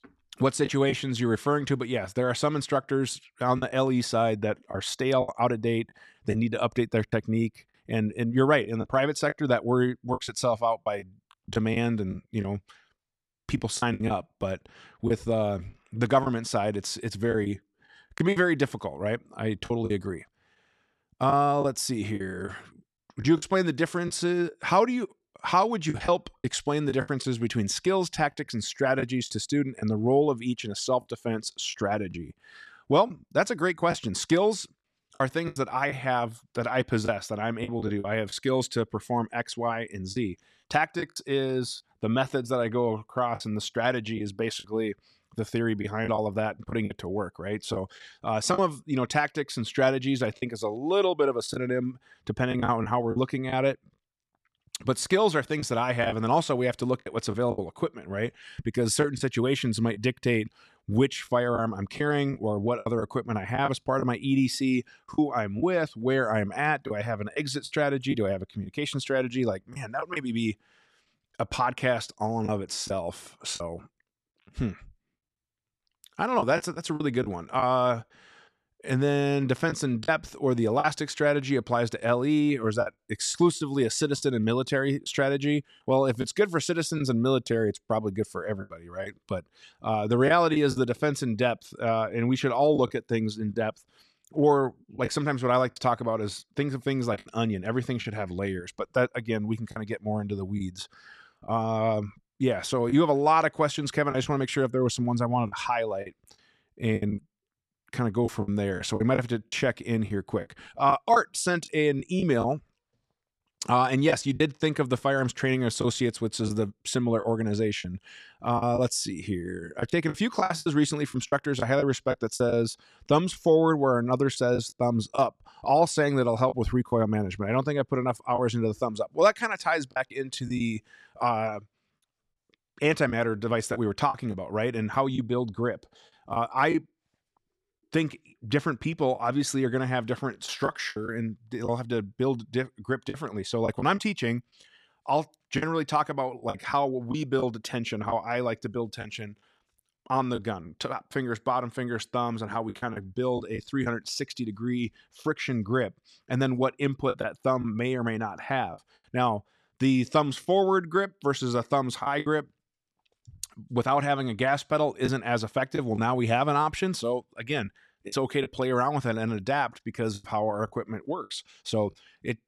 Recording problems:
choppy; occasionally; 5% of the speech affected

